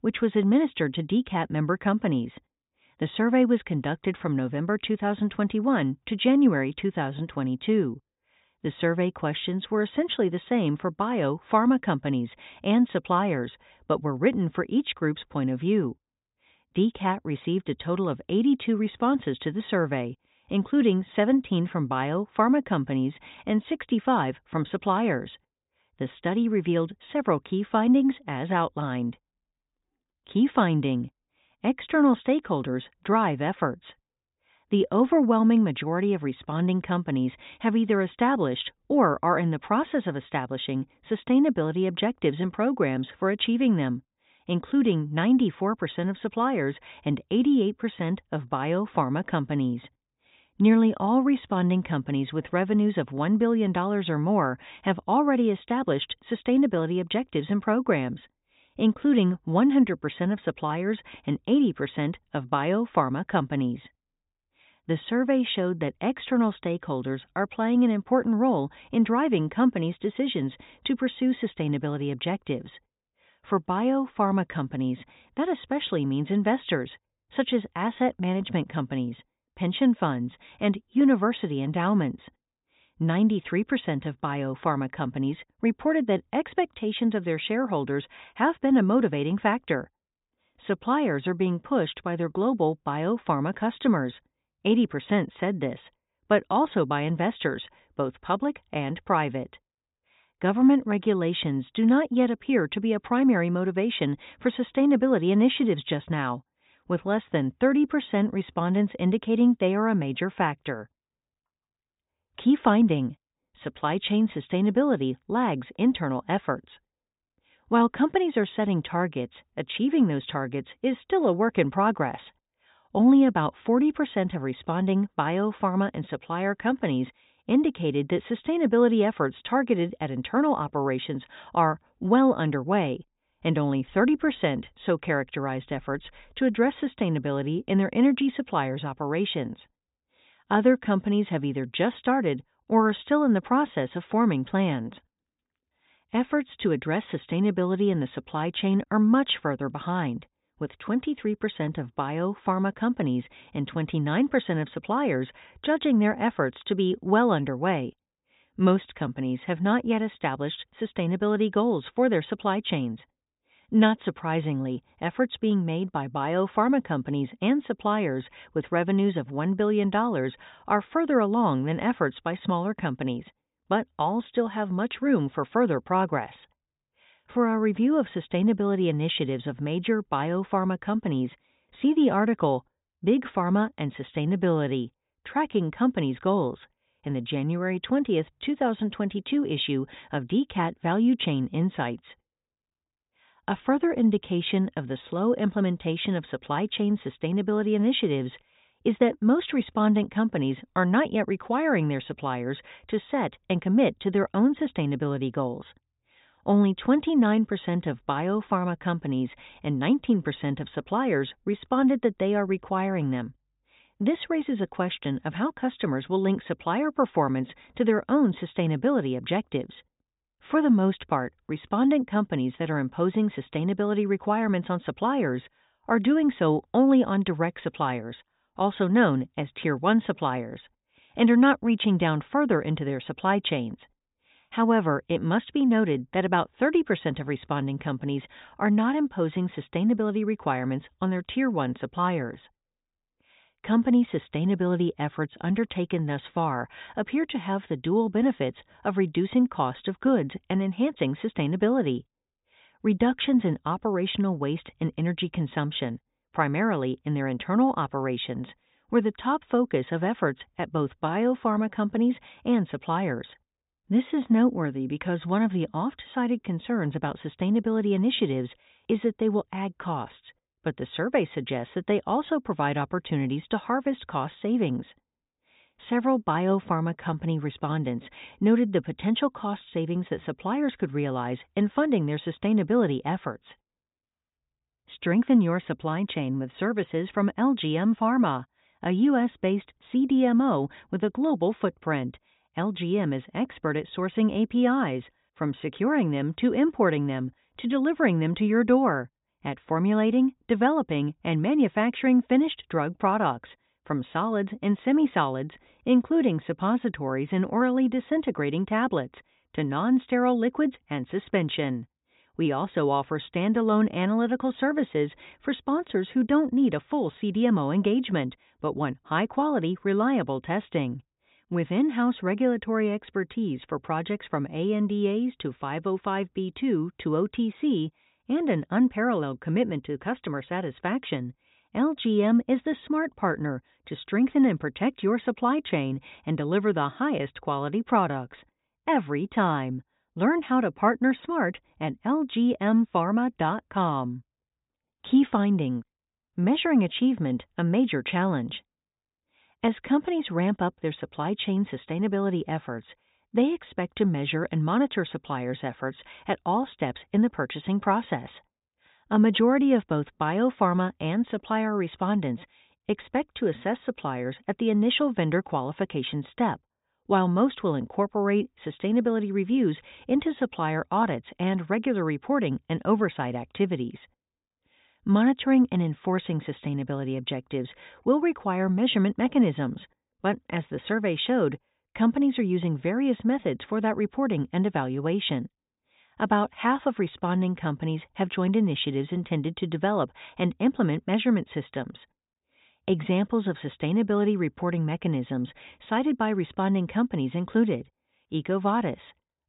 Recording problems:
high frequencies cut off; severe; nothing above 4 kHz

